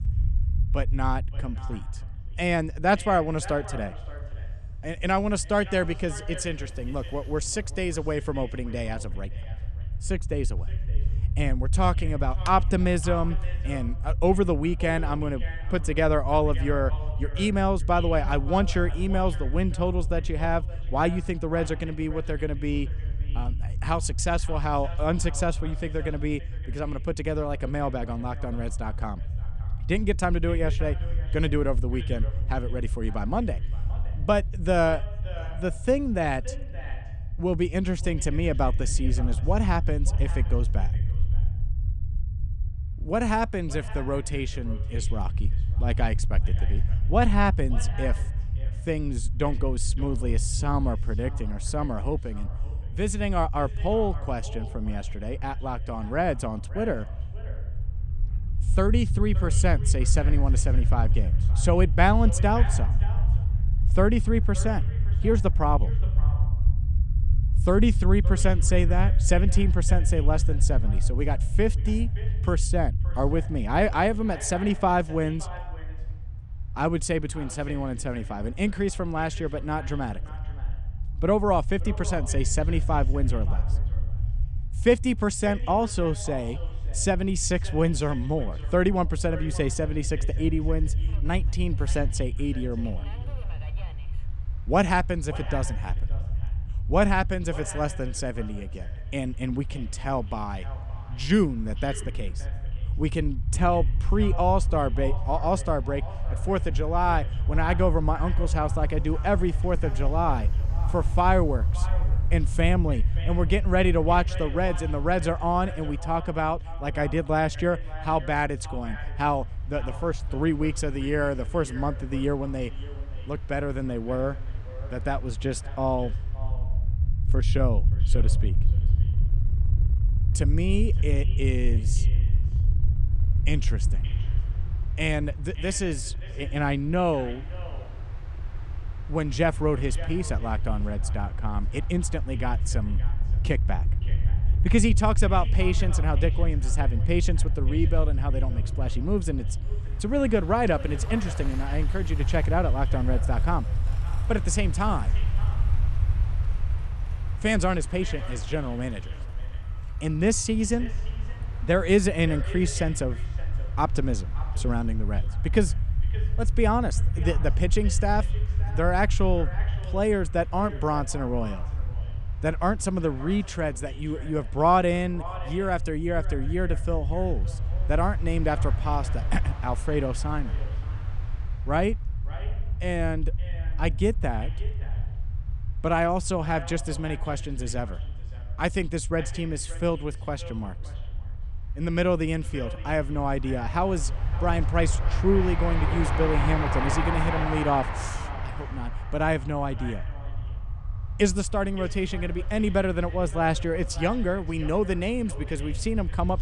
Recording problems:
echo of what is said; faint; throughout; 570 ms later, 20 dB below the speech
train or aircraft noise; noticeable; throughout; 15 dB below the speech
low rumble; noticeable; throughout; 20 dB below the speech

